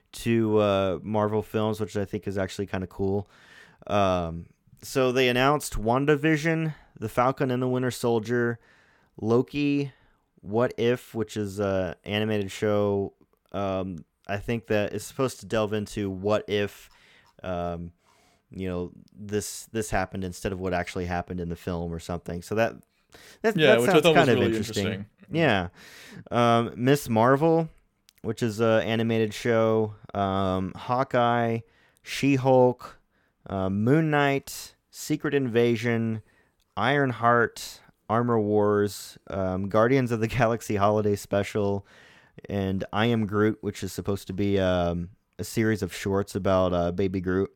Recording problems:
none

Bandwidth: 17 kHz